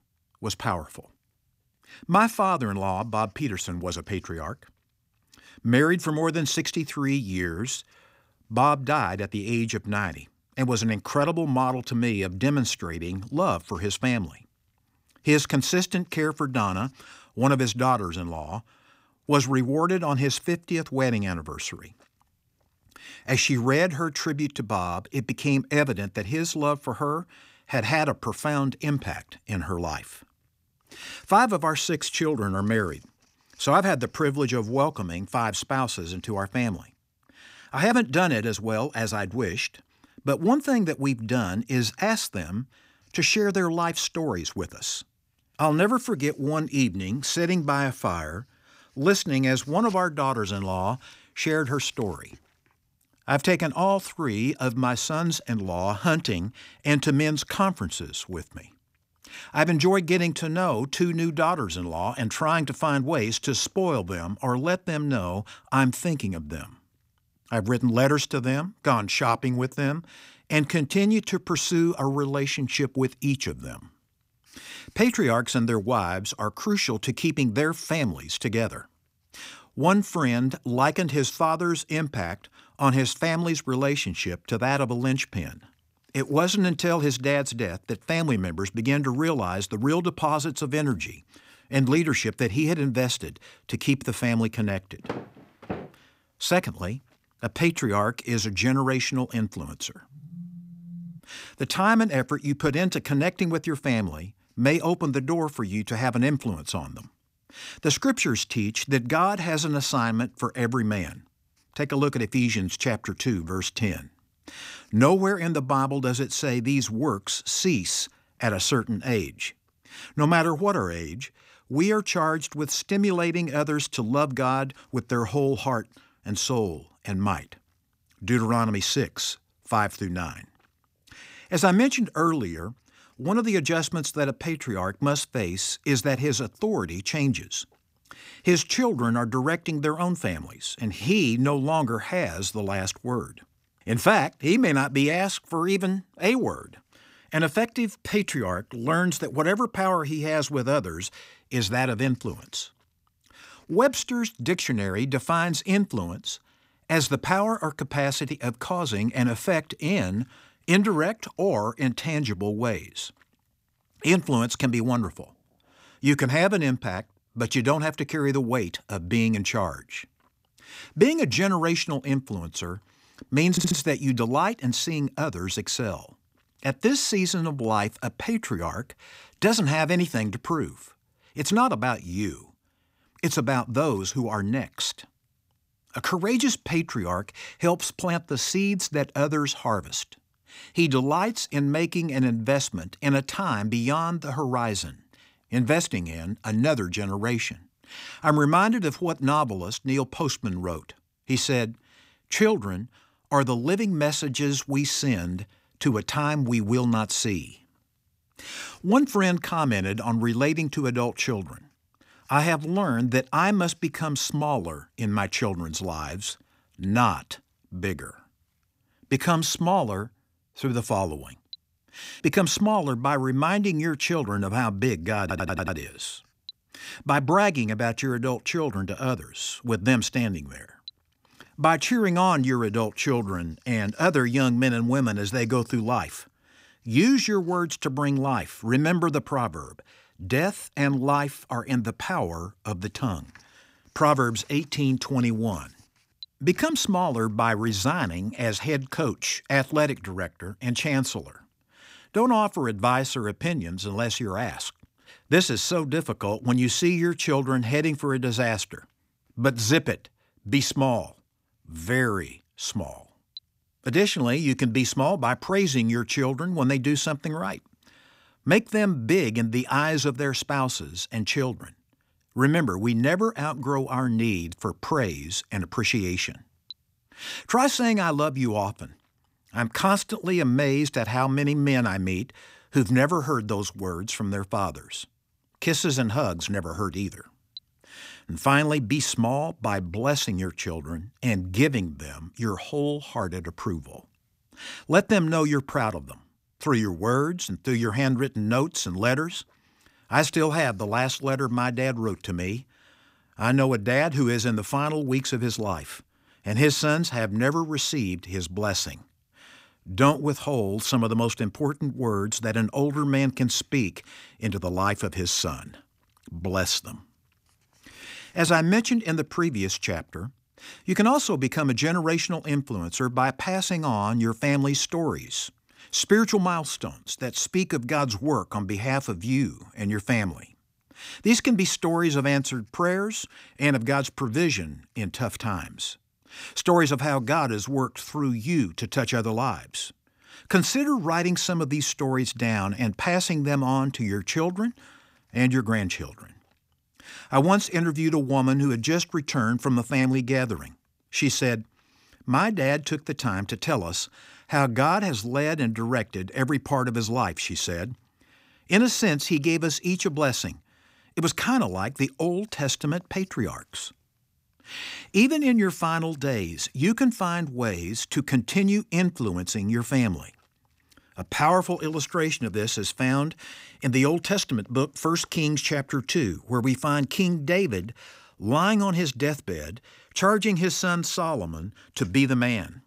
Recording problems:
phone ringing; faint; from 1:40 to 1:41; peak 15 dB below the speech
audio stuttering; at 2:54 and at 3:45

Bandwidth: 15.5 kHz